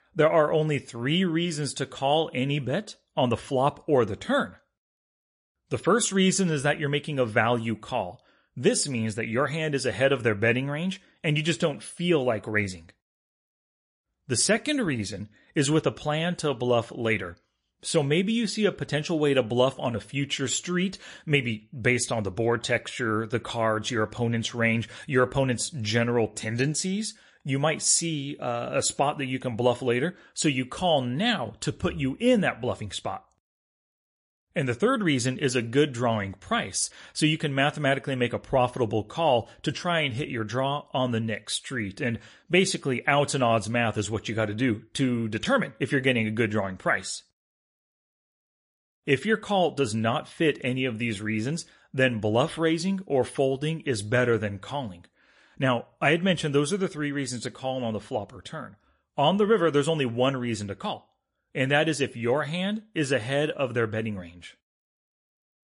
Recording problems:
garbled, watery; slightly; nothing above 10.5 kHz

